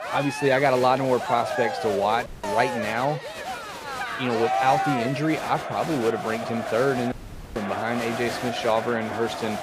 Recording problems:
crowd noise; loud; throughout; 5 dB below the speech
audio cutting out; at 2.5 s and at 7 s

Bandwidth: 15 kHz